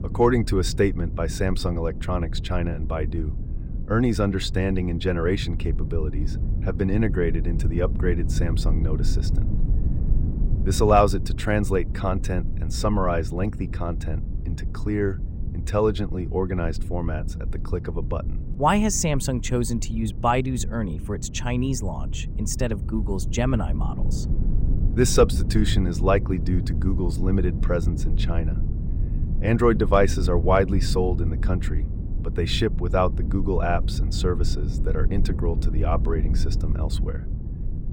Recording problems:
low rumble; noticeable; throughout; 15 dB below the speech

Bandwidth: 16 kHz